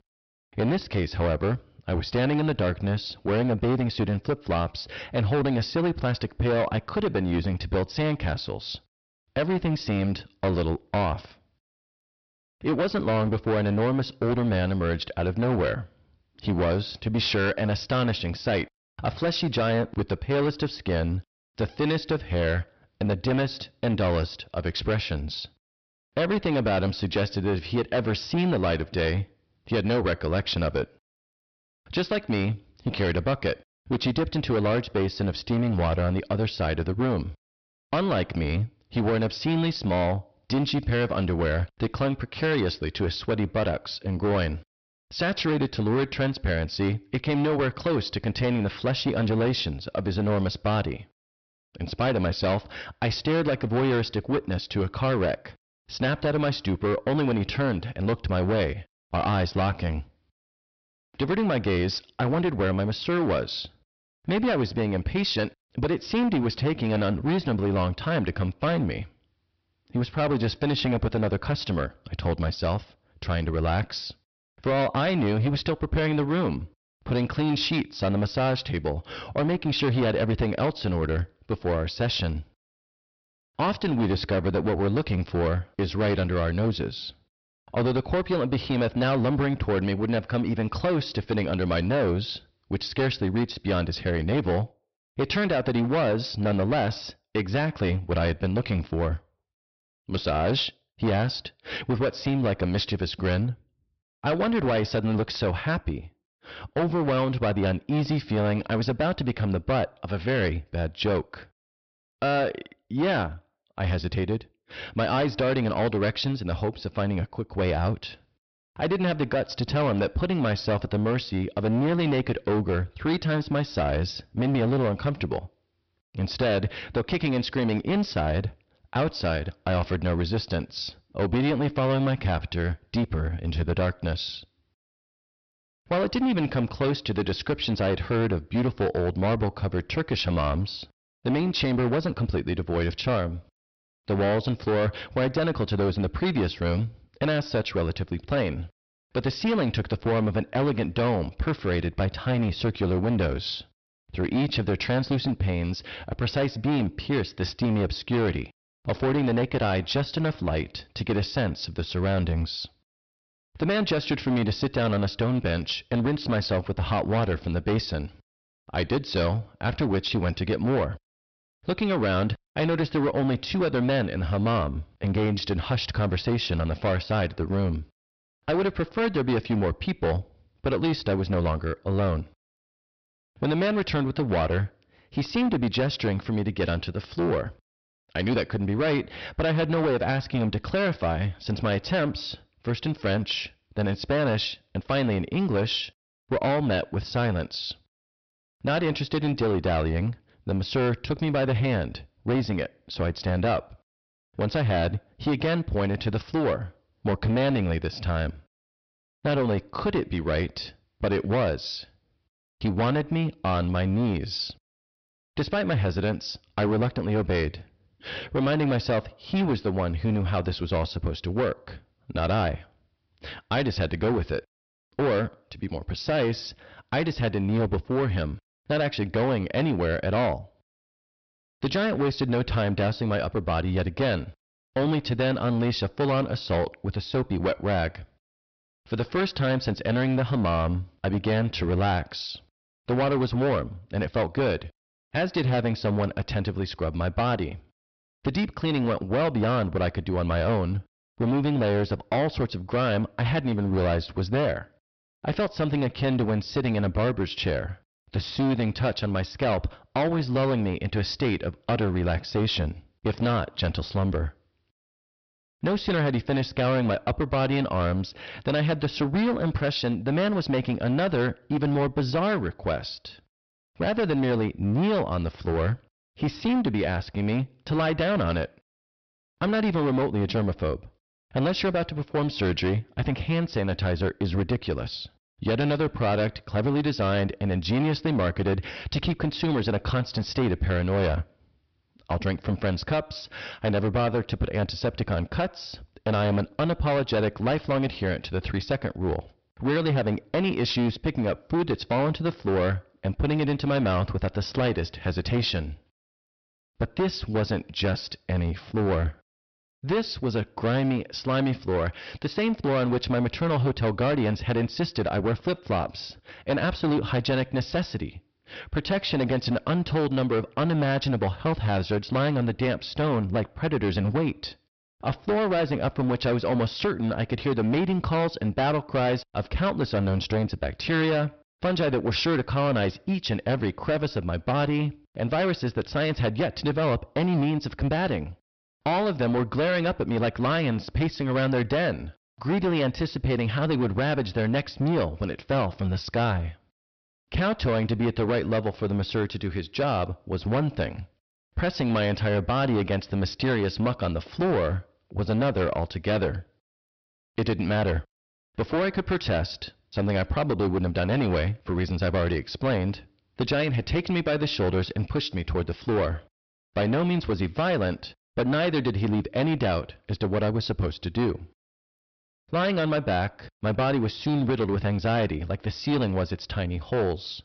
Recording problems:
distortion; heavy; 15% of the sound clipped
high frequencies cut off; noticeable; nothing above 5.5 kHz

